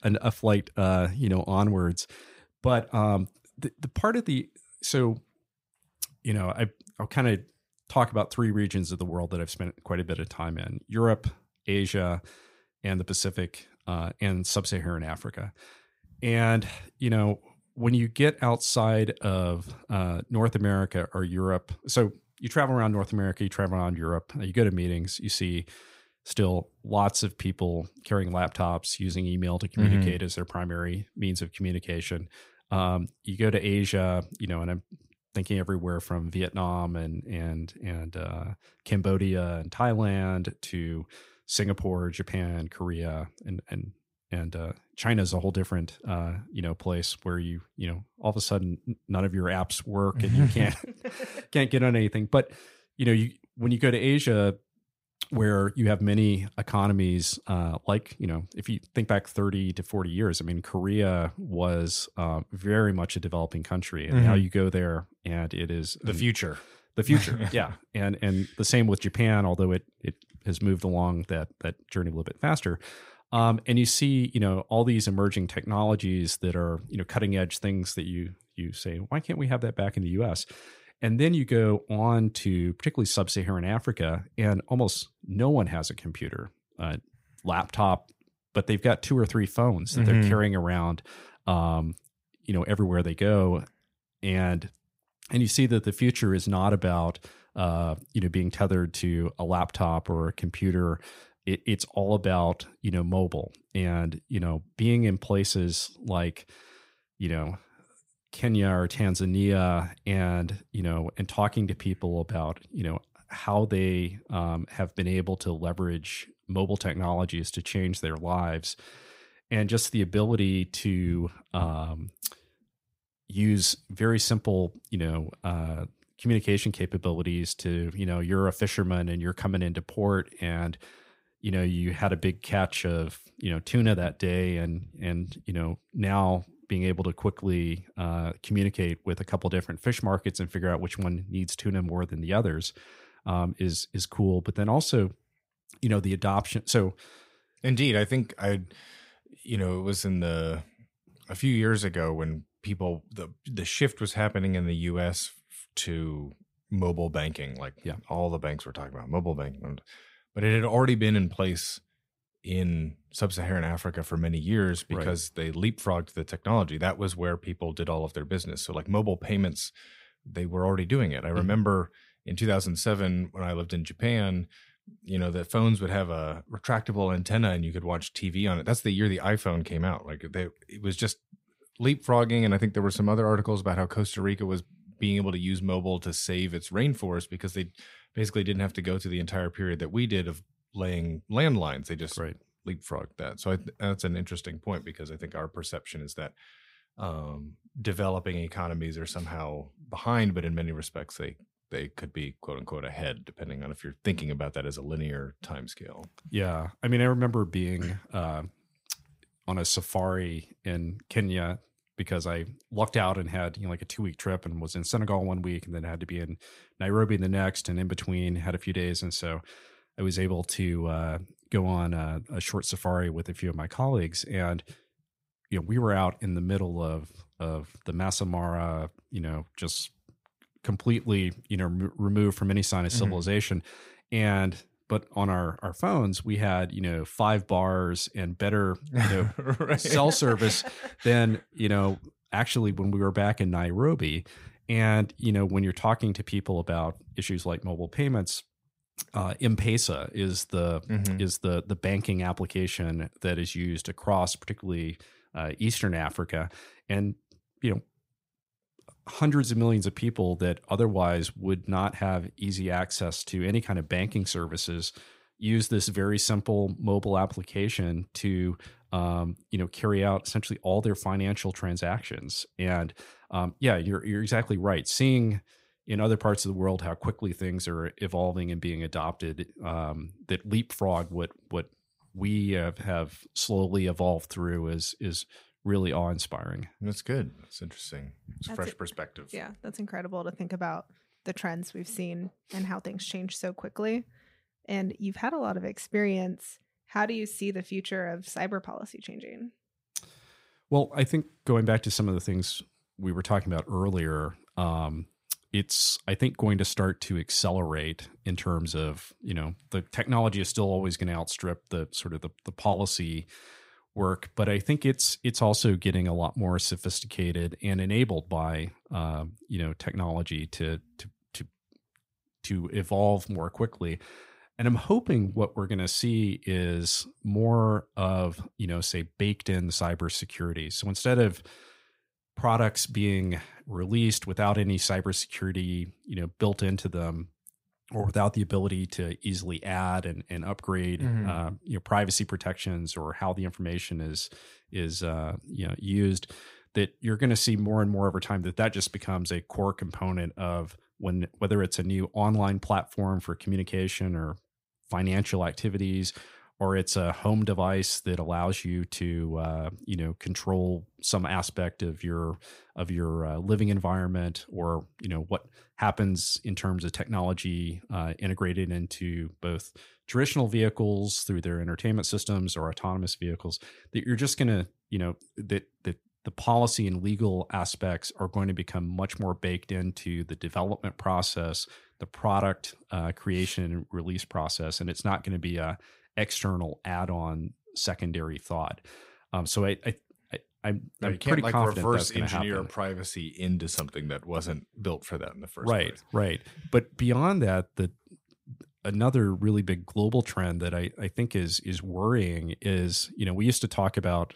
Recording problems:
none

